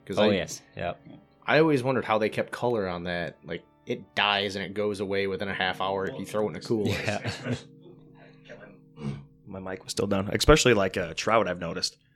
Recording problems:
background music; faint; throughout; 25 dB below the speech

